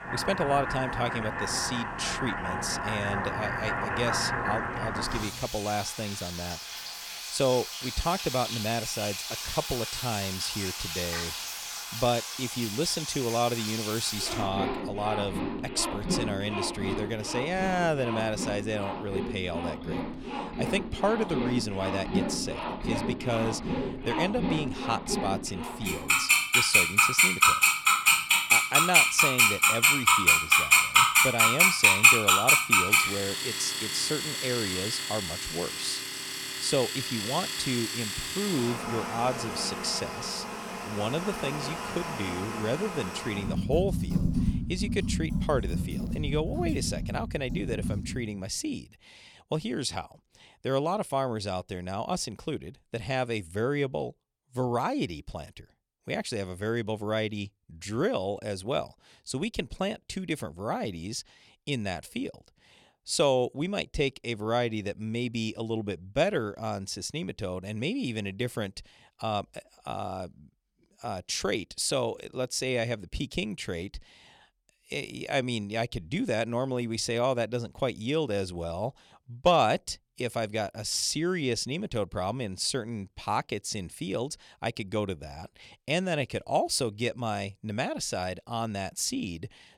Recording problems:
household noises; very loud; until 48 s; 5 dB above the speech

